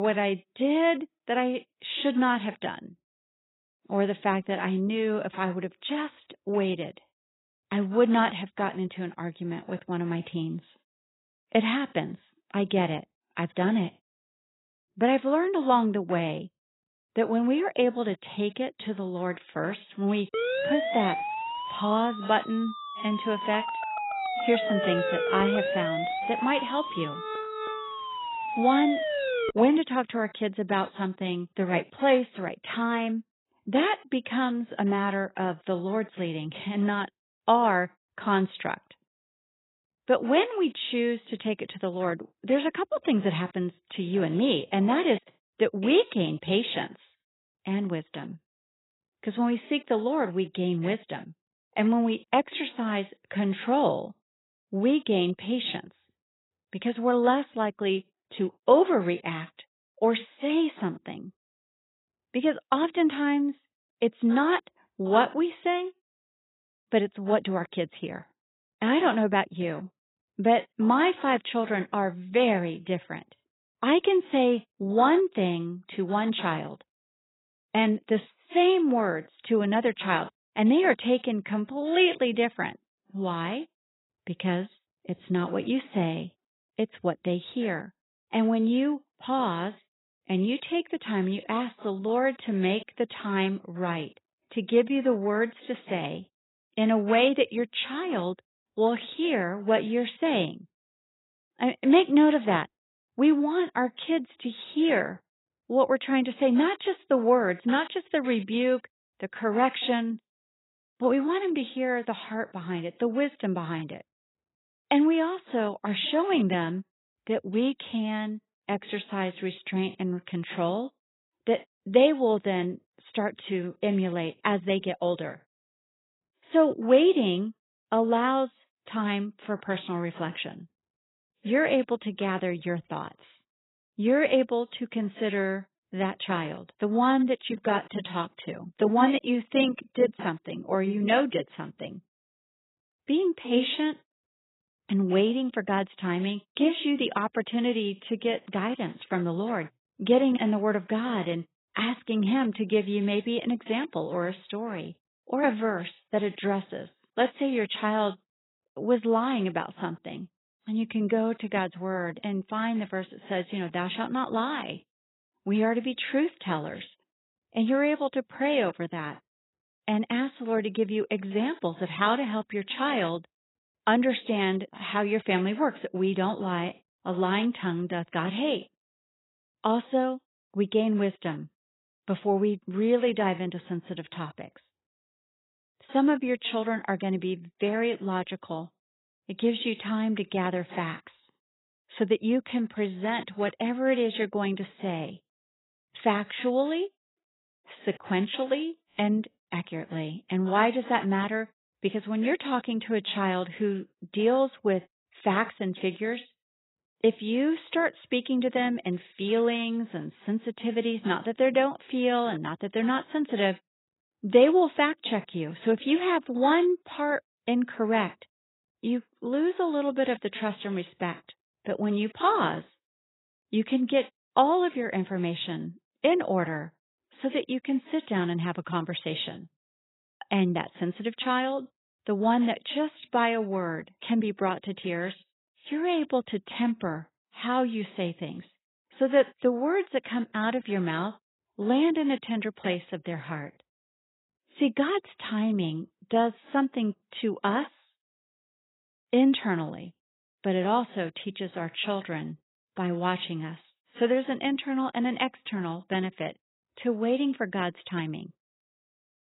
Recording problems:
garbled, watery; badly; nothing above 4 kHz
abrupt cut into speech; at the start
siren; loud; from 20 to 30 s; peak level with the speech

